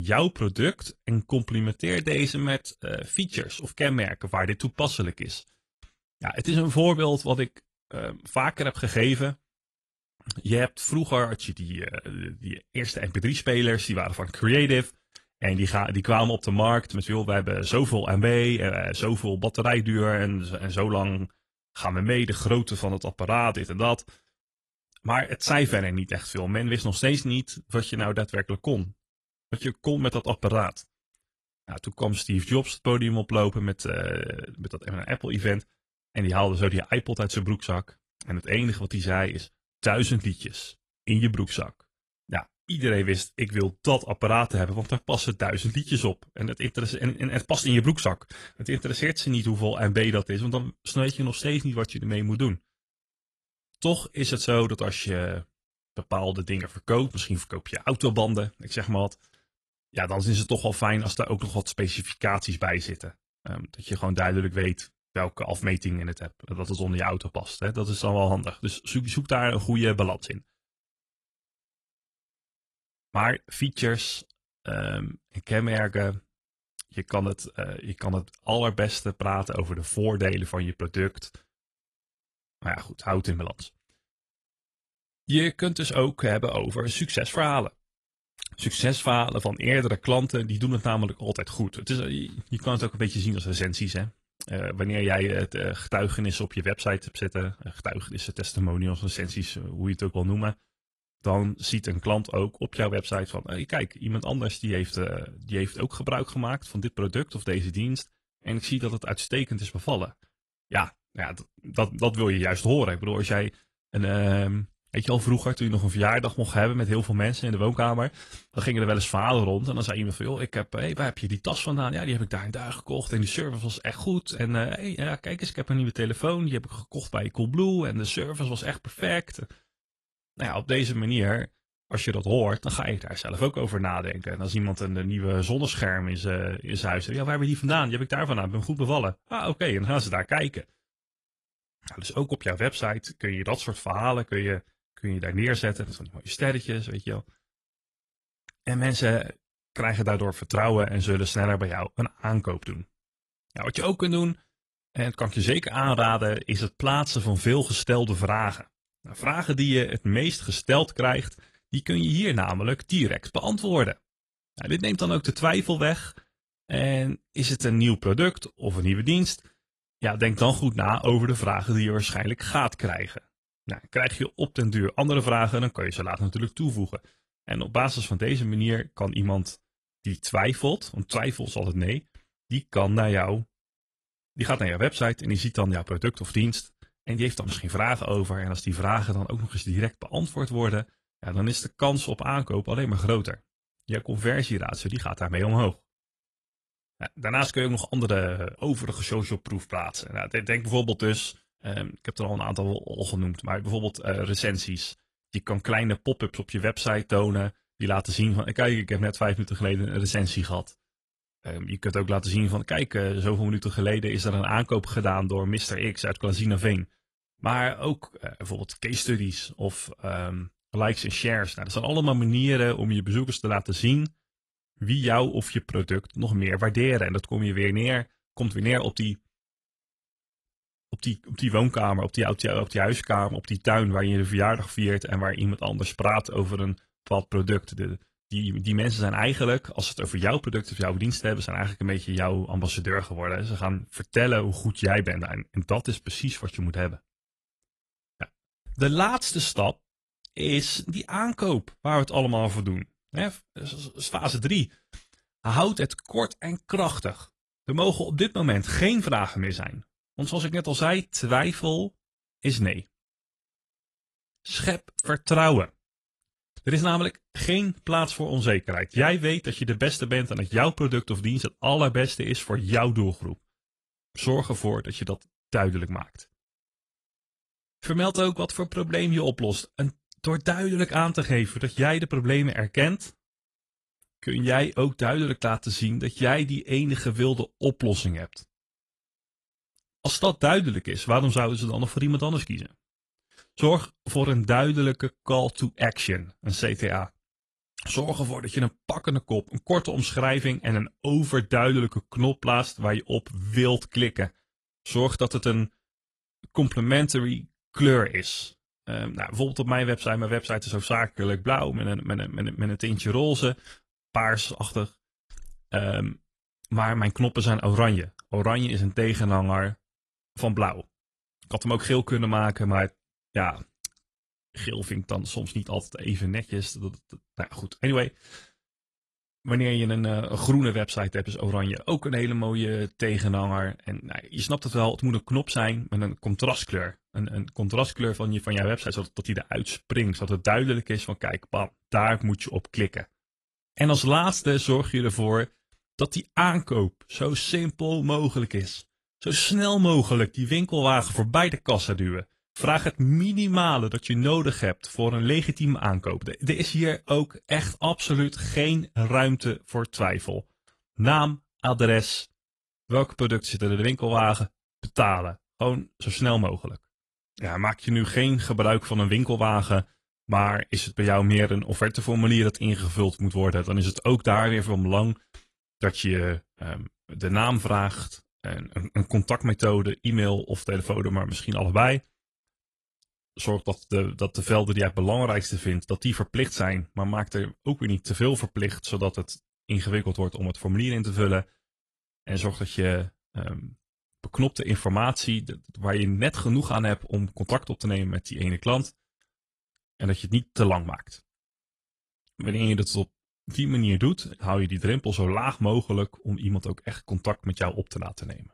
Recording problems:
garbled, watery; slightly; nothing above 11 kHz
abrupt cut into speech; at the start

